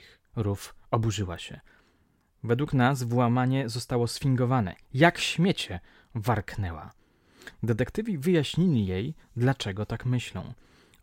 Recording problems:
none

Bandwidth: 16 kHz